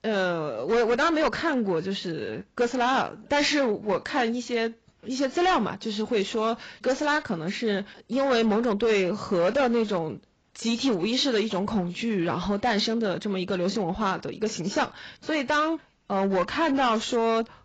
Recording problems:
garbled, watery; badly; nothing above 7.5 kHz
distortion; slight; 8% of the sound clipped

